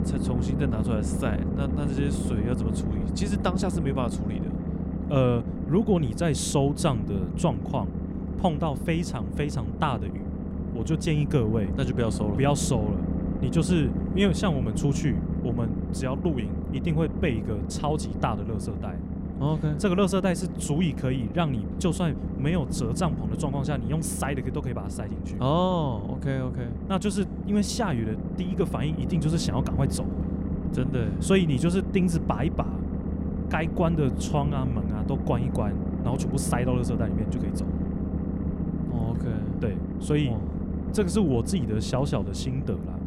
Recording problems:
low rumble; loud; throughout; 6 dB below the speech

